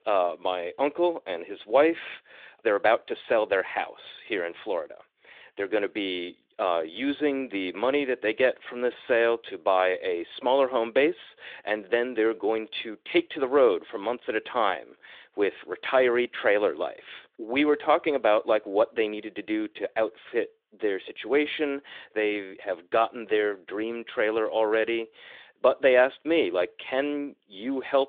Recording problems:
phone-call audio

